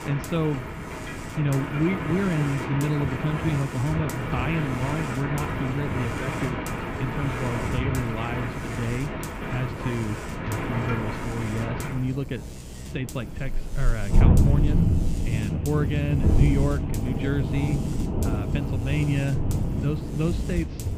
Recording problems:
muffled; very; fading above 2.5 kHz
rain or running water; very loud; throughout; as loud as the speech
animal sounds; loud; throughout; 9 dB below the speech
electrical hum; noticeable; throughout; 50 Hz, 15 dB below the speech
wind noise on the microphone; occasional gusts; 15 dB below the speech

